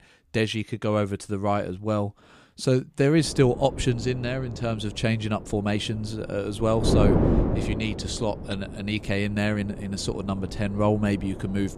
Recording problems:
wind noise on the microphone; heavy; from 3 s on; 6 dB below the speech

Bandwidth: 15 kHz